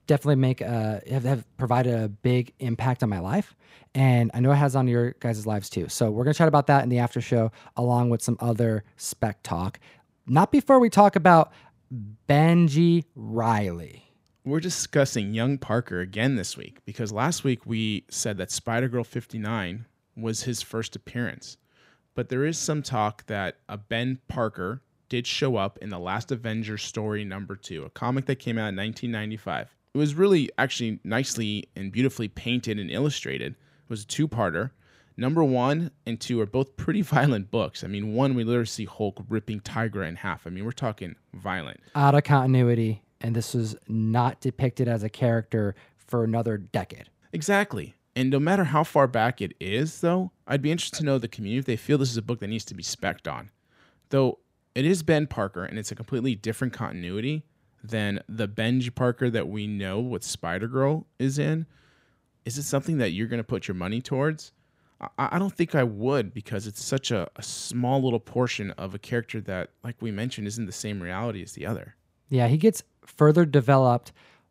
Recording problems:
none

